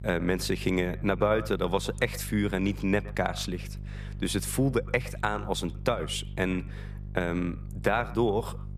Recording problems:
echo of what is said; faint; throughout; 120 ms later, 20 dB below the speech
electrical hum; faint; throughout; 50 Hz, 25 dB below the speech

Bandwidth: 14.5 kHz